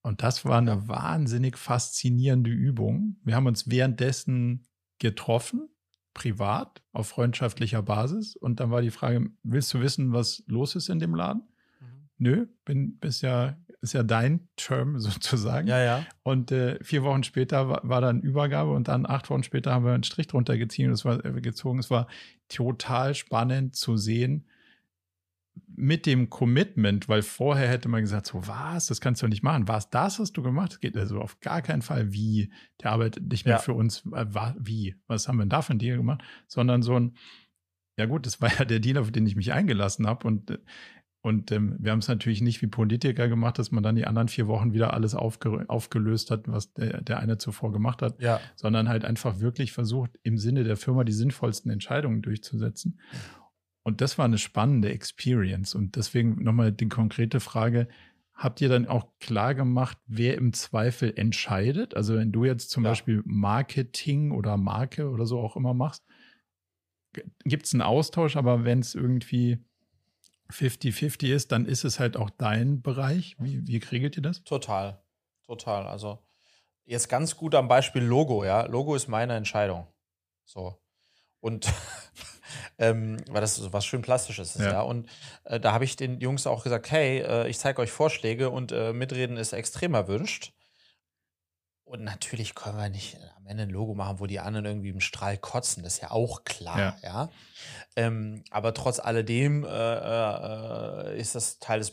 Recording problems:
none

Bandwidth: 15 kHz